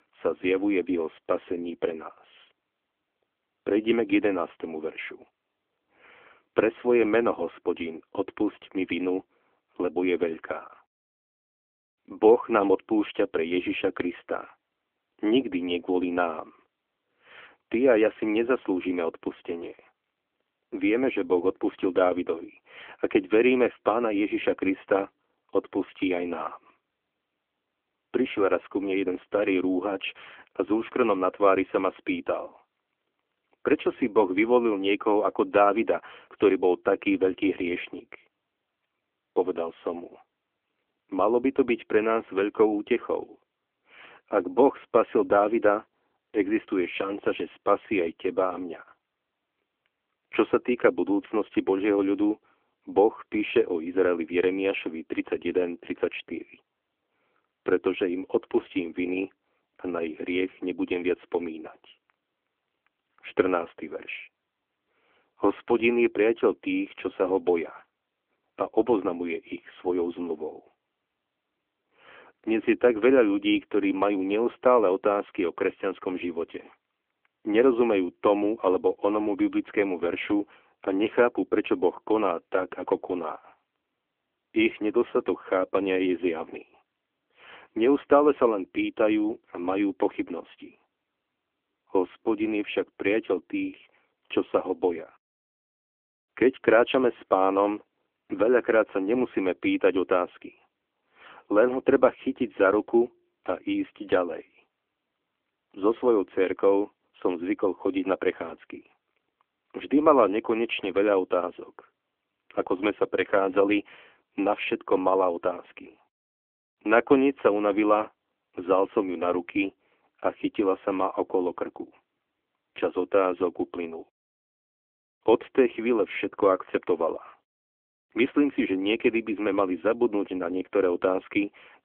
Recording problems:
phone-call audio; nothing above 3.5 kHz

